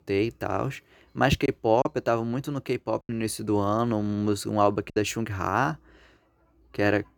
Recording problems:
choppy; occasionally; 3% of the speech affected

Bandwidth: 18.5 kHz